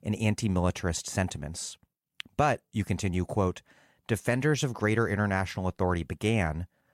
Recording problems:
none

